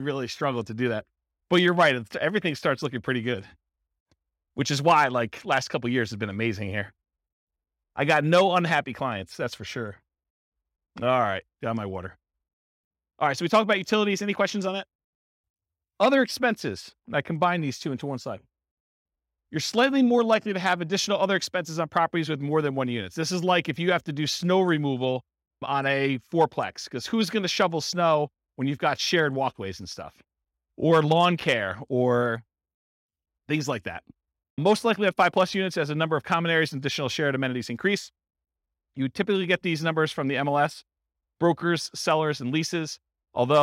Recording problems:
abrupt cut into speech; at the start and the end

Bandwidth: 16 kHz